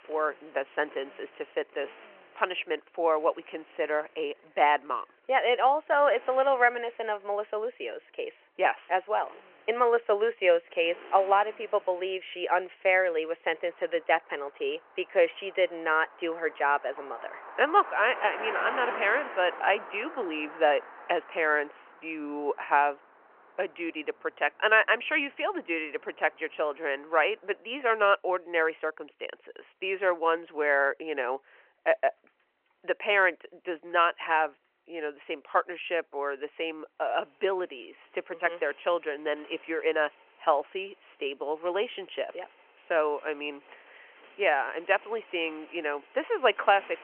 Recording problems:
phone-call audio; nothing above 3 kHz
traffic noise; noticeable; throughout; 15 dB below the speech

